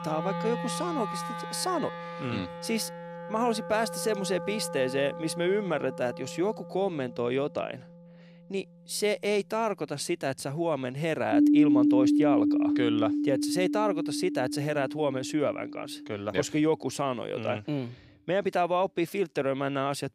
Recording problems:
background music; very loud; throughout; as loud as the speech

